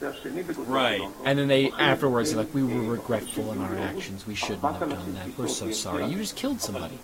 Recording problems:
garbled, watery; slightly; nothing above 15.5 kHz
voice in the background; loud; throughout; 7 dB below the speech
hiss; noticeable; throughout; 20 dB below the speech

